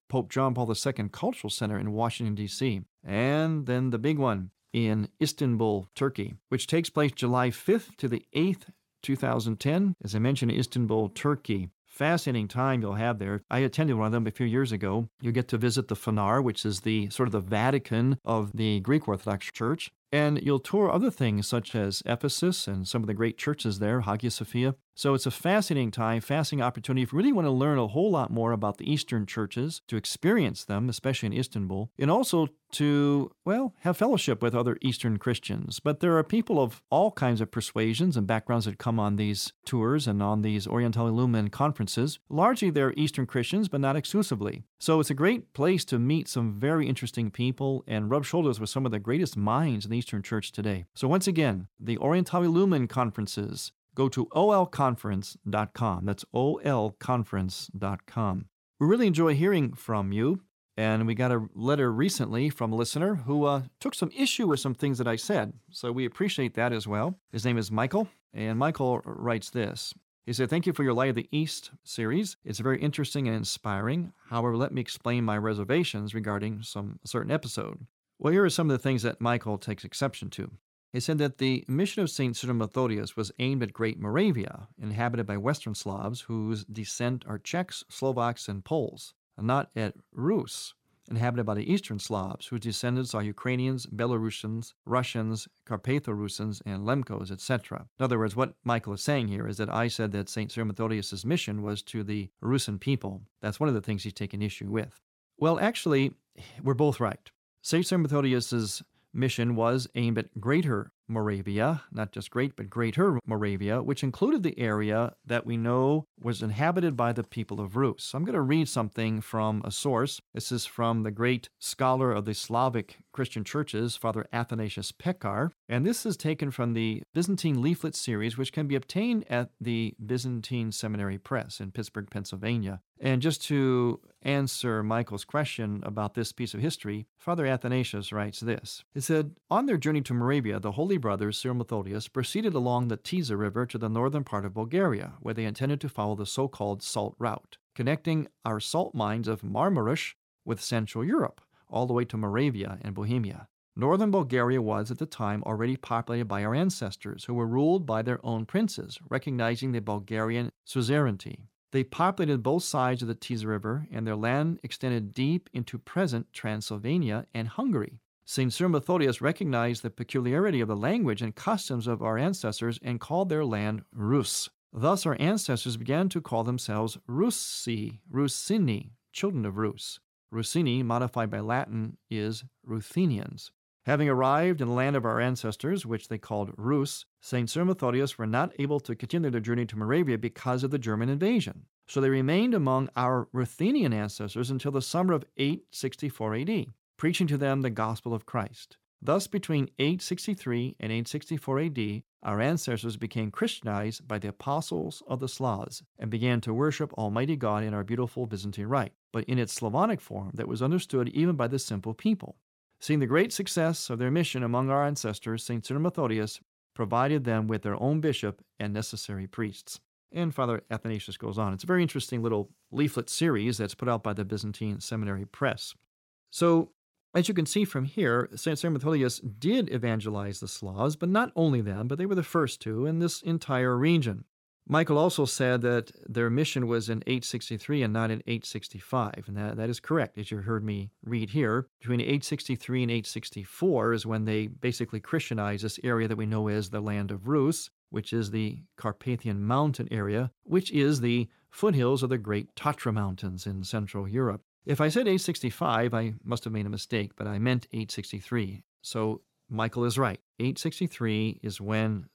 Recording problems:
none

